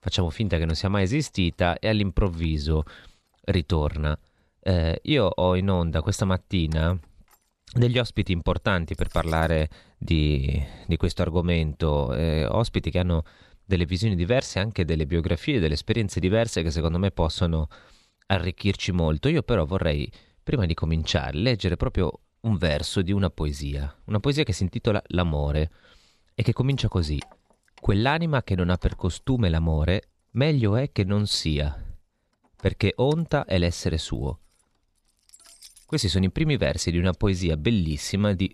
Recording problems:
household noises; faint; throughout; 30 dB below the speech

